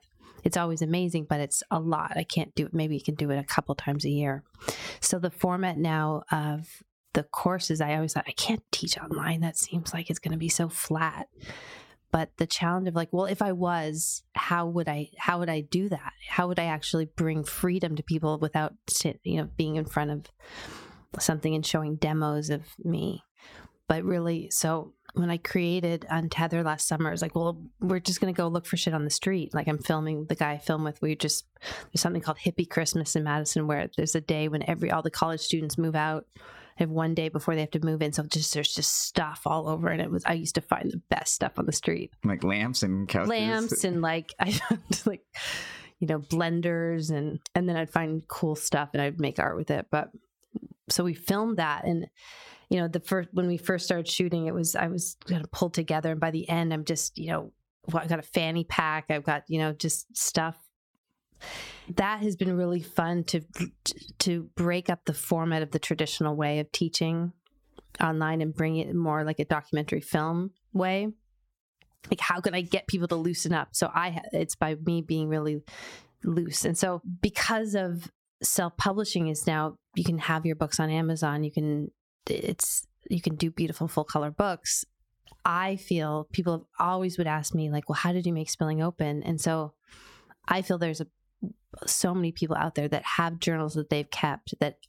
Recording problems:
squashed, flat; somewhat

